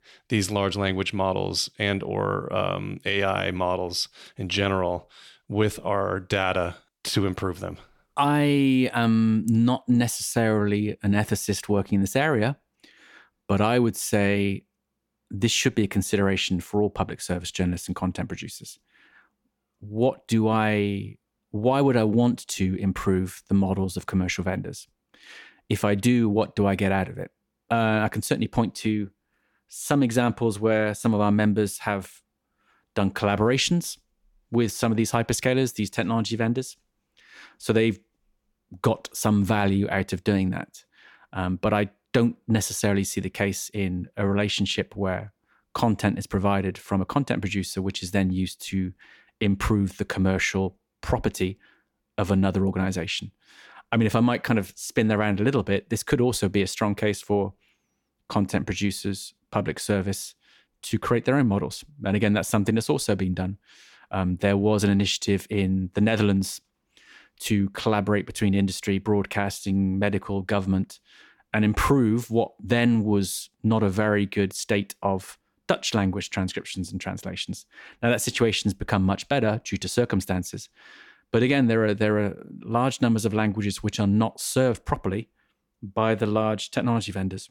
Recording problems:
none

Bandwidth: 17 kHz